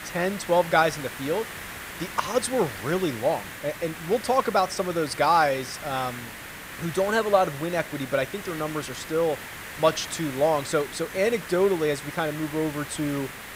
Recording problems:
hiss; noticeable; throughout; 10 dB below the speech

